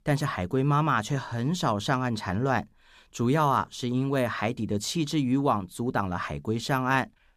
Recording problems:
none

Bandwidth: 14.5 kHz